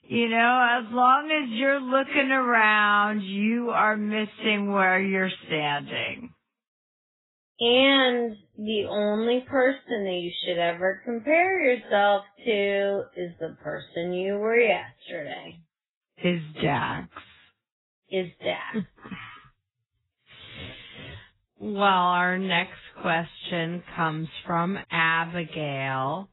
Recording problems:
garbled, watery; badly; nothing above 4 kHz
wrong speed, natural pitch; too slow; 0.6 times normal speed

